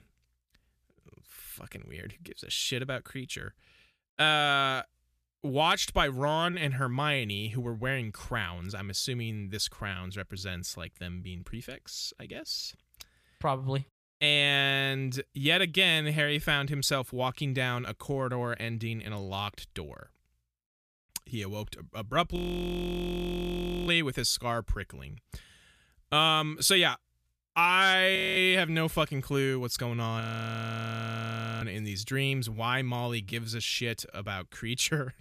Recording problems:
audio freezing; at 22 s for 1.5 s, at 28 s and at 30 s for 1.5 s

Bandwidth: 14.5 kHz